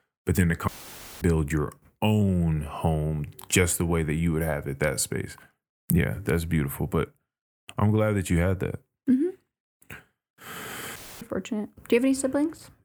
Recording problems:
audio cutting out; filled with static; at 0.5 s for 0.5 s and at 11 s

